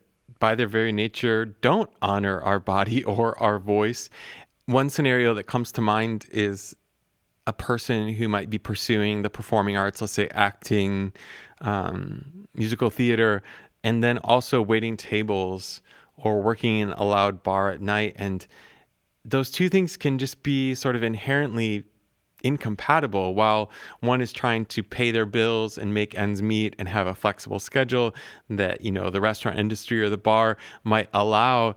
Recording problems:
garbled, watery; slightly

